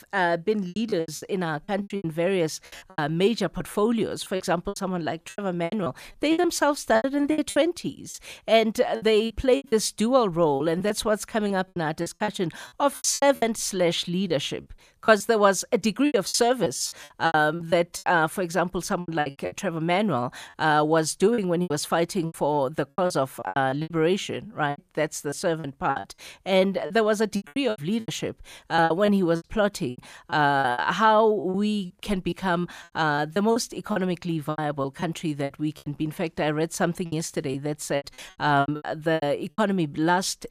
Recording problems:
choppy; very; 14% of the speech affected

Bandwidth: 14.5 kHz